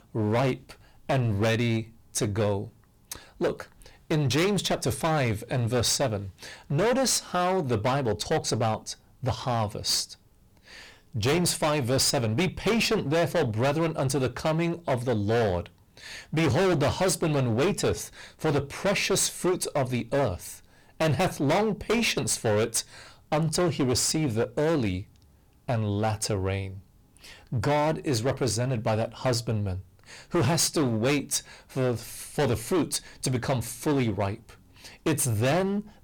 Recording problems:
distortion; heavy; 17% of the sound clipped

